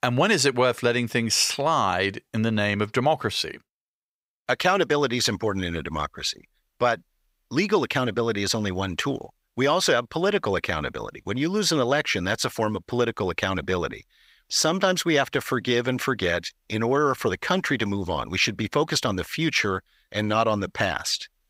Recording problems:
none

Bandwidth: 15.5 kHz